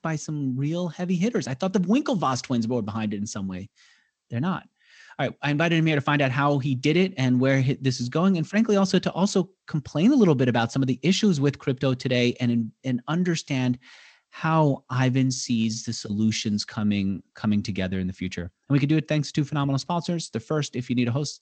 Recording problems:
garbled, watery; slightly; nothing above 8 kHz

